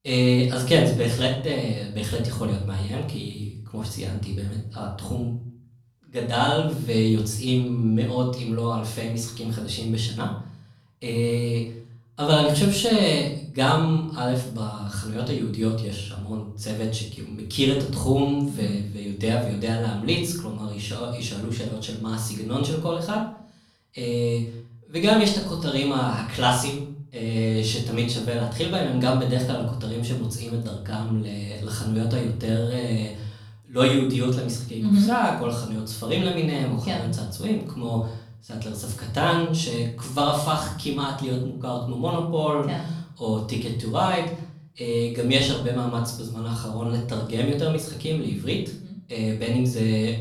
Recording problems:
off-mic speech; far
room echo; noticeable; dies away in 0.5 s

